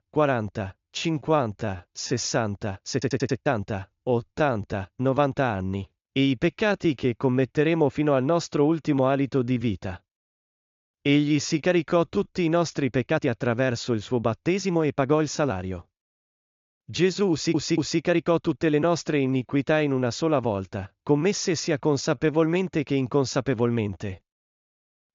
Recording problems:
high frequencies cut off; noticeable; nothing above 7 kHz
uneven, jittery; strongly; from 1 to 22 s
audio stuttering; at 3 s and at 17 s

